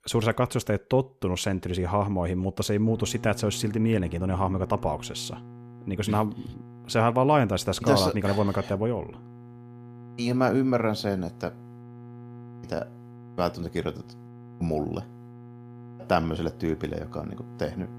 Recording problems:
electrical hum; faint; from 3 s on; 60 Hz, 20 dB below the speech

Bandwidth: 14.5 kHz